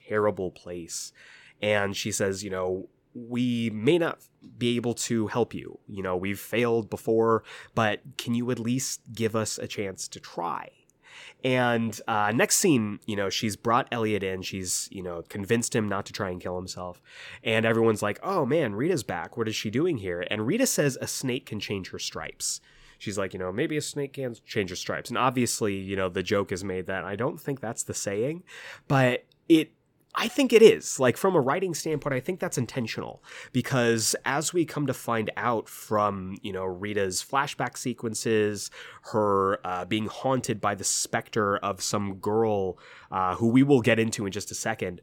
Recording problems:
none

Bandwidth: 17 kHz